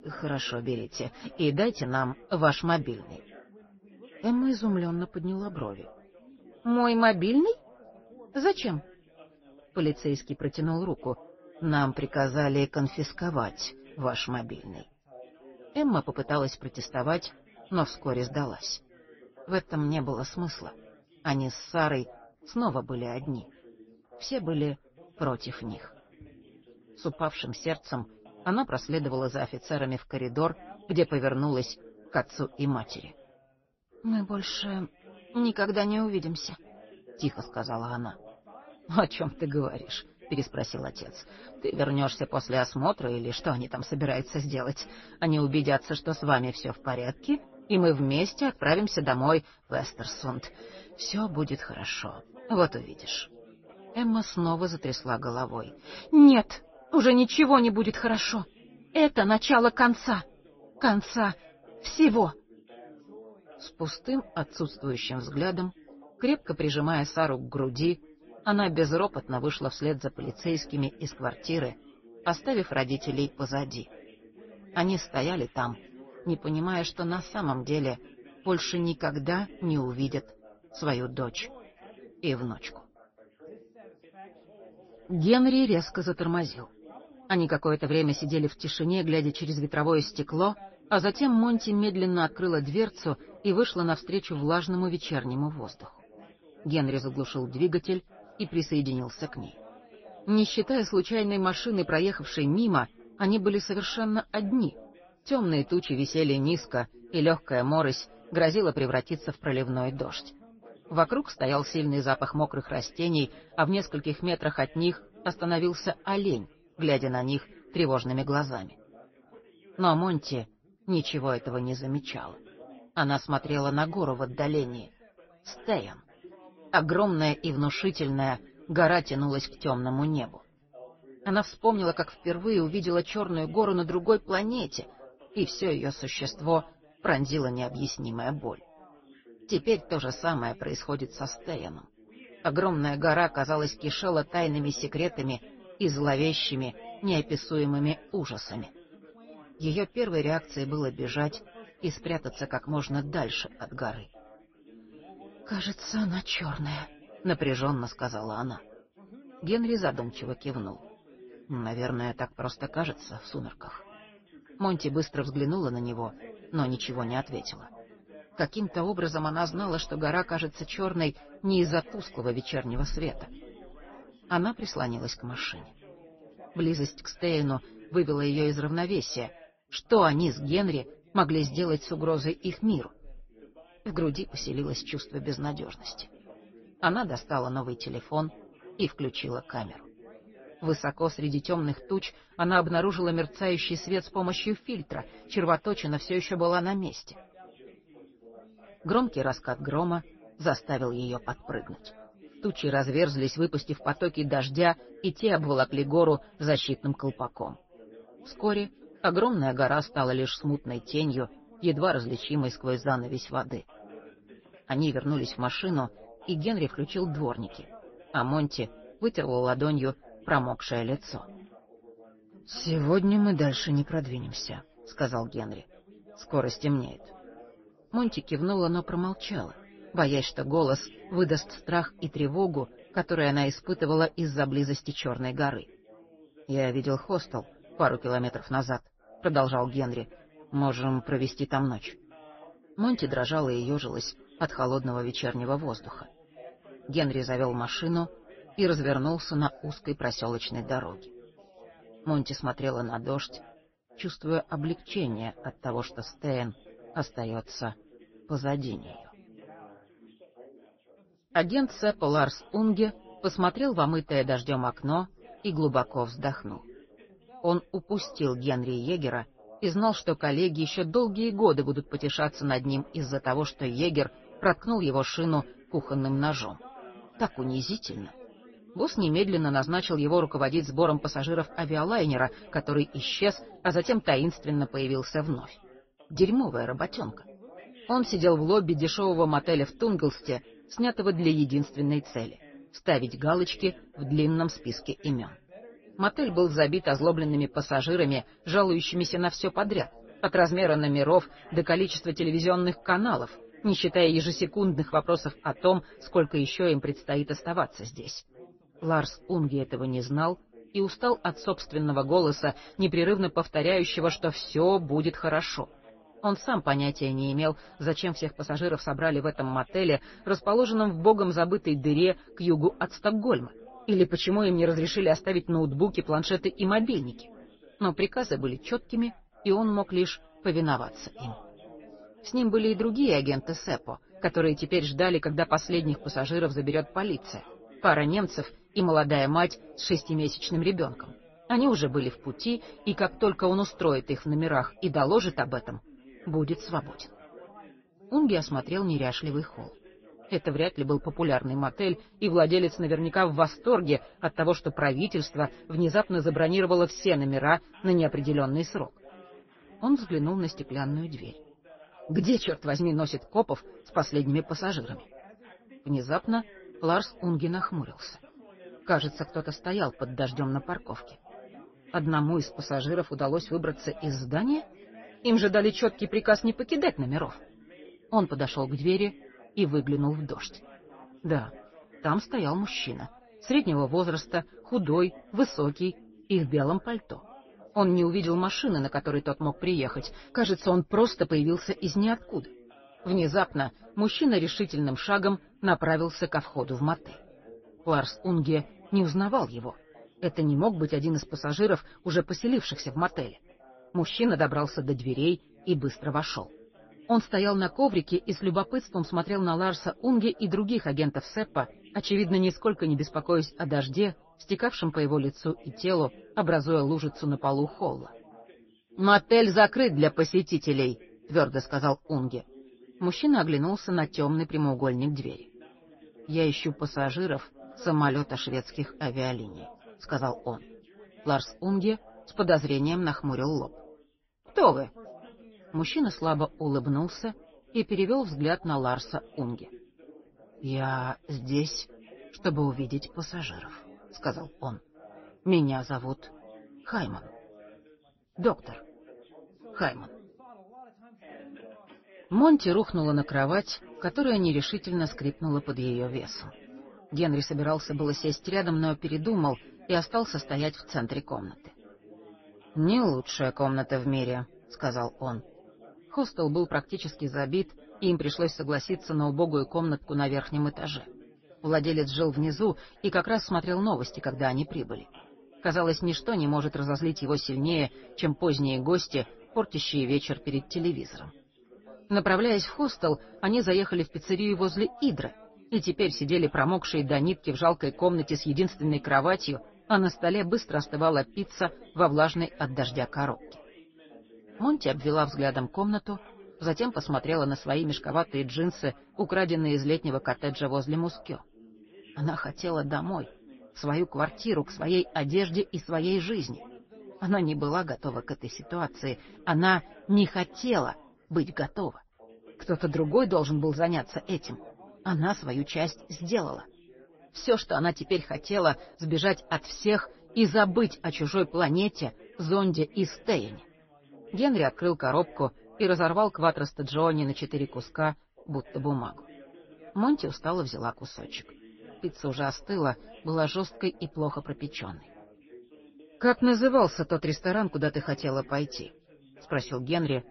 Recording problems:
garbled, watery; slightly; nothing above 6 kHz
background chatter; faint; throughout; 3 voices, 25 dB below the speech

